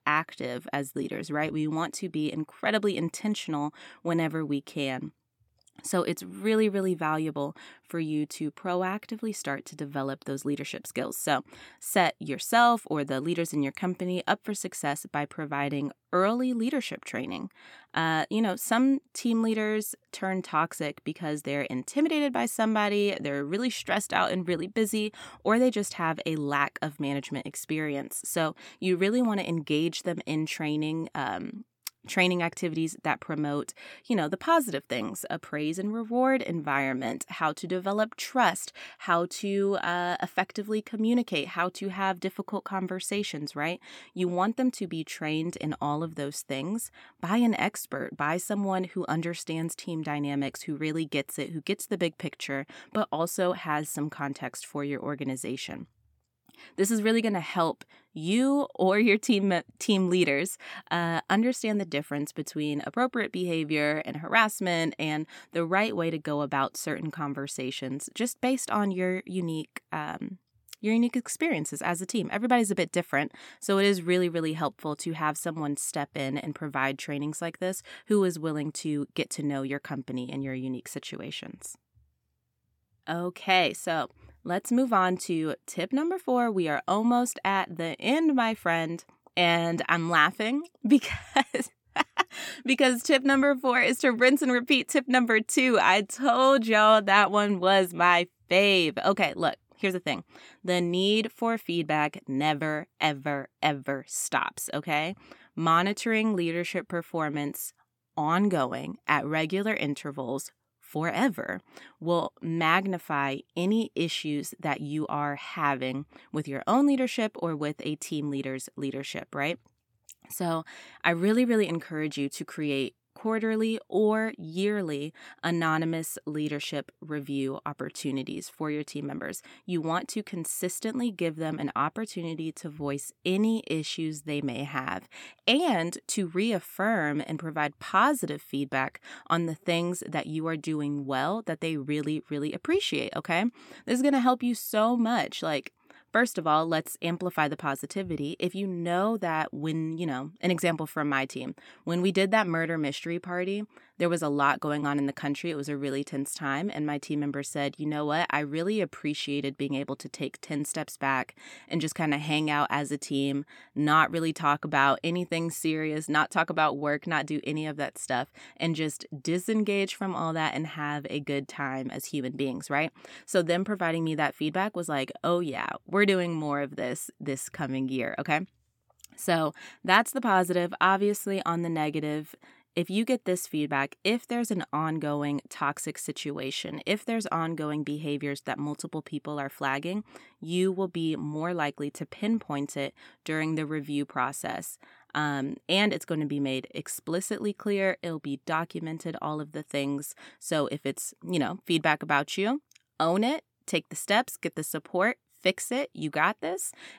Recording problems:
none

